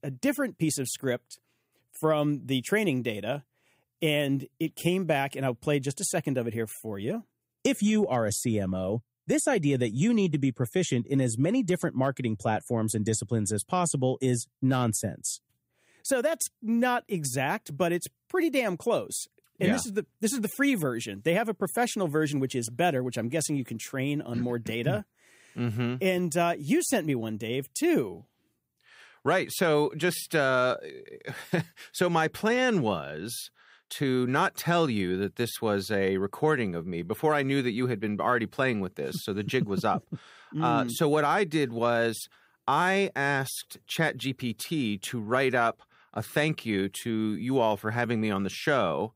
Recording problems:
none

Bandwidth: 15.5 kHz